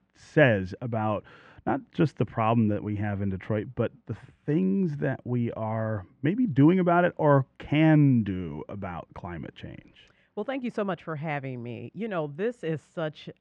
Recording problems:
muffled; very; fading above 2 kHz

